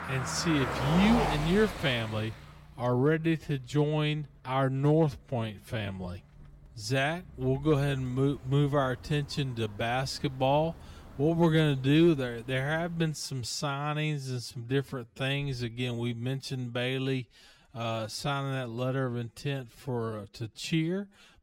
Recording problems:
wrong speed, natural pitch; too slow; 0.6 times normal speed
traffic noise; loud; until 13 s; 7 dB below the speech

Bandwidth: 16.5 kHz